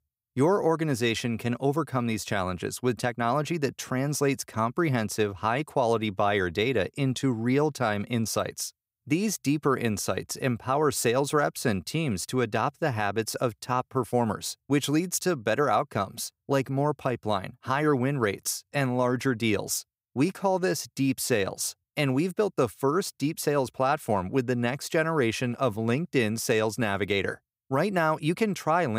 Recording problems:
abrupt cut into speech; at the end

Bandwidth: 15.5 kHz